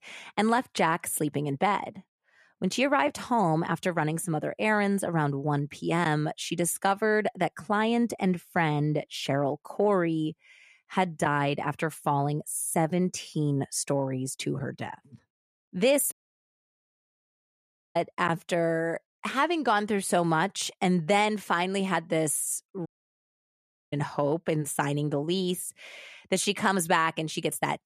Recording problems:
audio cutting out; at 16 s for 2 s and at 23 s for 1 s

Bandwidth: 14.5 kHz